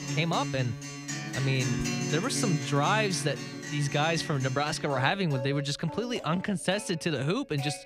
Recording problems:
background music; loud; throughout; 6 dB below the speech

